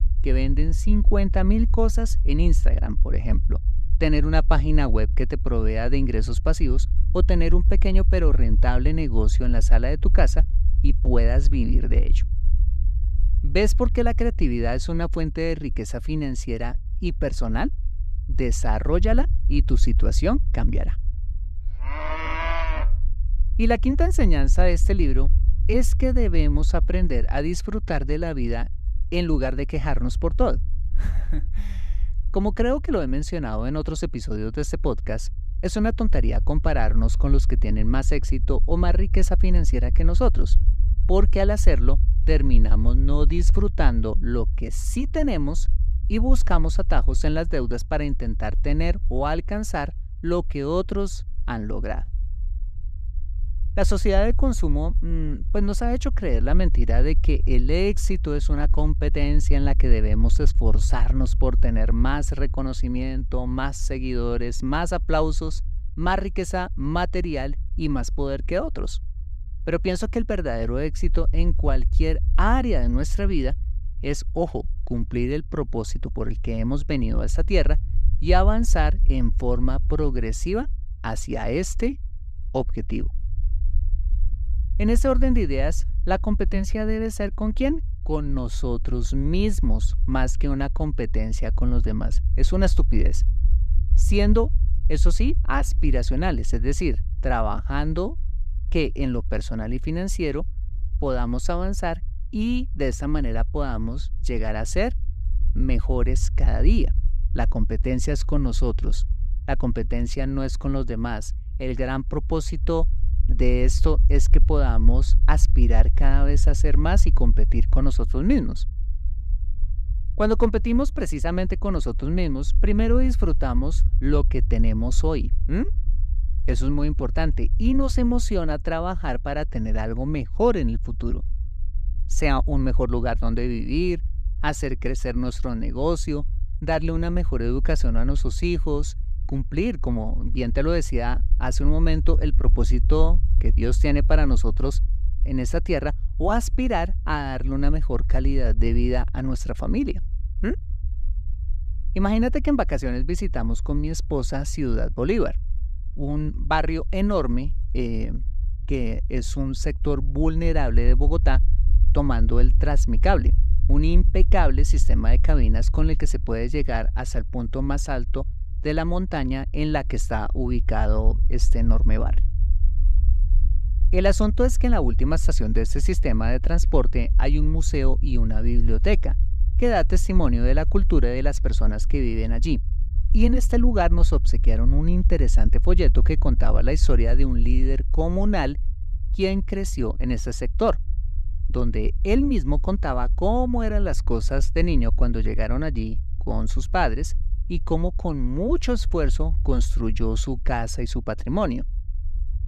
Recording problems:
low rumble; noticeable; throughout; 20 dB below the speech

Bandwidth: 15 kHz